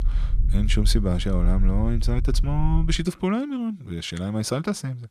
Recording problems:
low rumble; noticeable; until 3 s; 15 dB below the speech

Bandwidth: 14 kHz